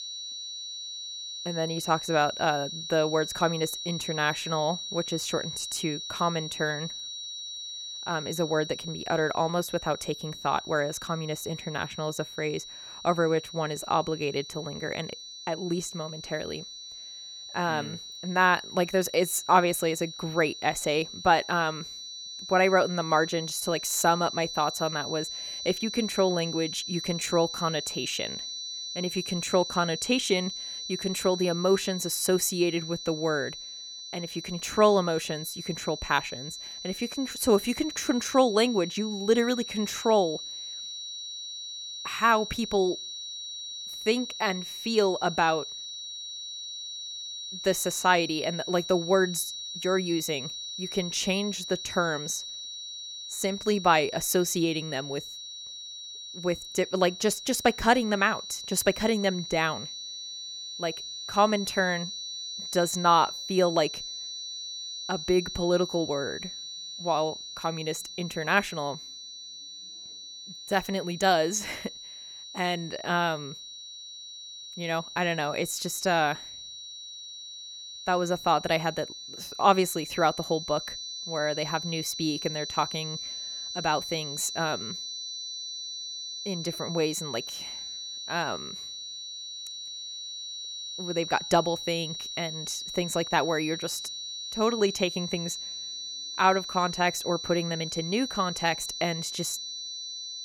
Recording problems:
high-pitched whine; loud; throughout; 4 kHz, 8 dB below the speech

